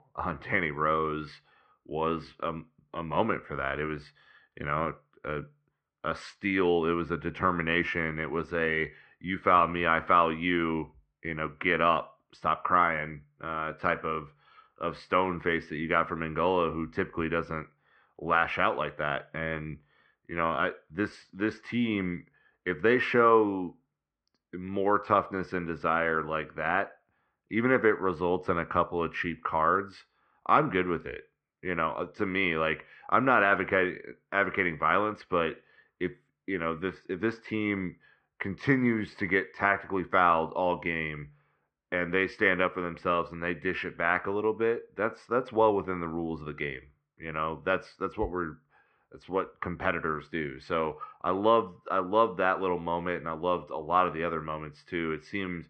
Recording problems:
muffled; very; fading above 2.5 kHz

